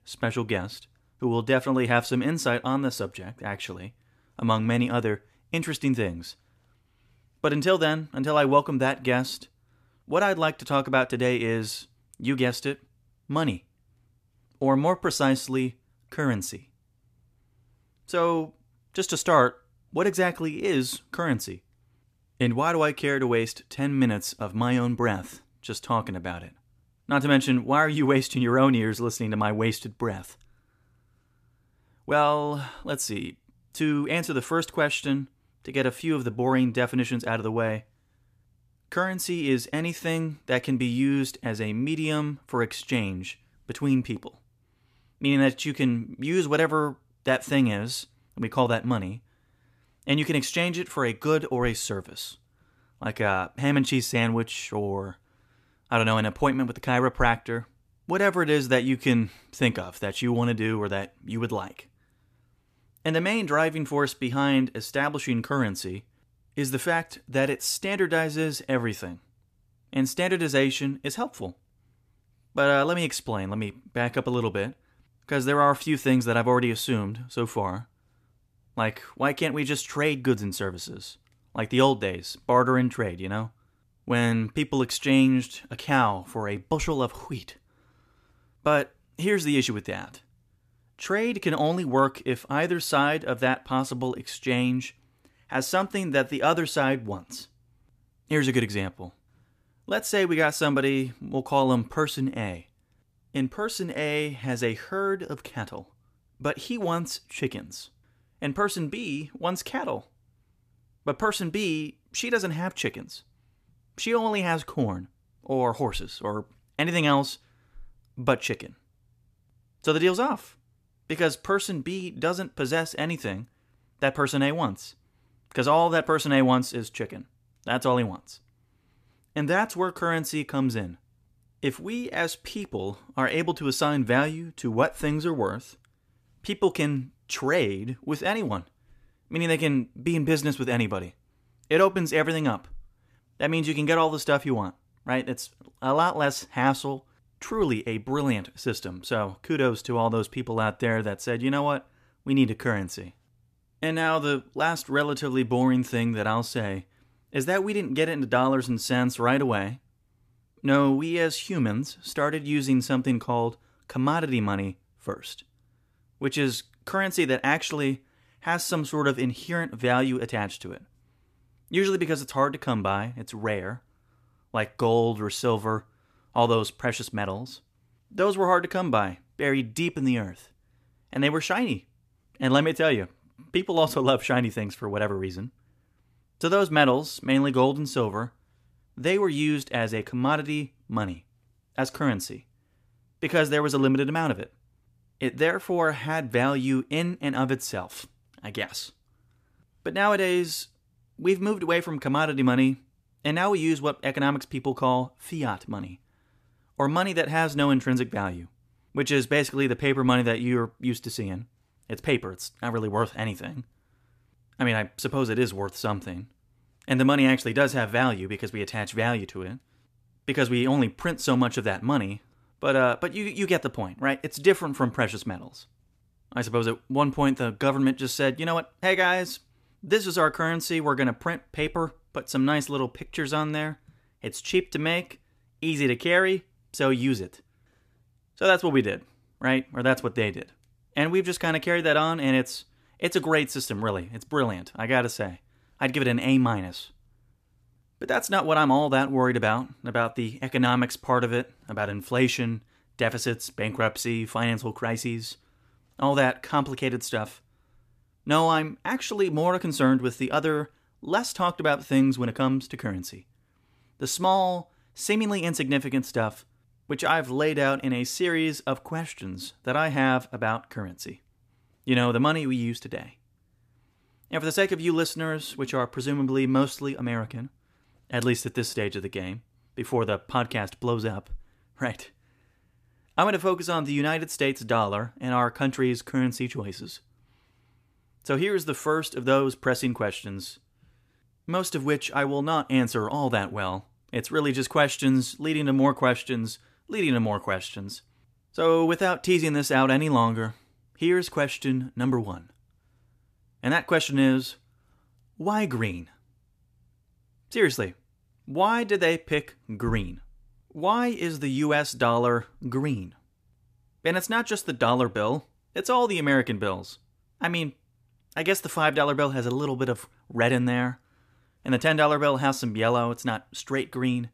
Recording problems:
none

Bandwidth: 14.5 kHz